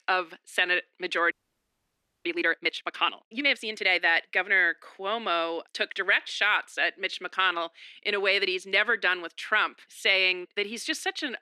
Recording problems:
thin; very; fading below 300 Hz
audio freezing; at 1.5 s for 1 s

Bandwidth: 14 kHz